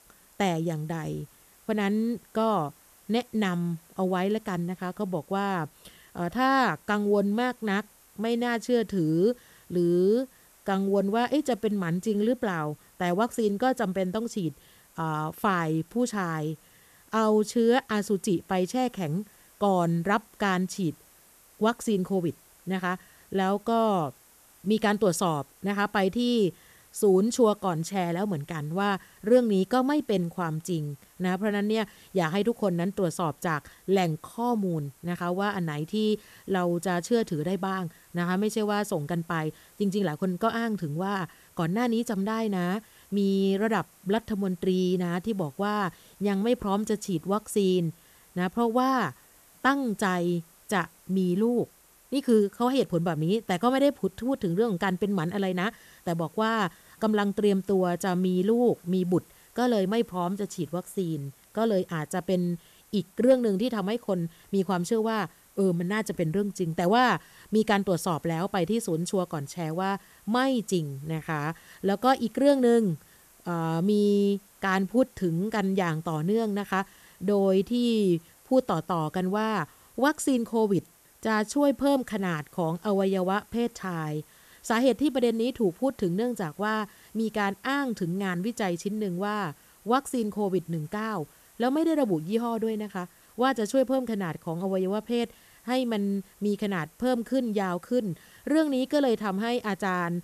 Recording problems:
hiss; faint; throughout; 30 dB below the speech

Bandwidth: 14 kHz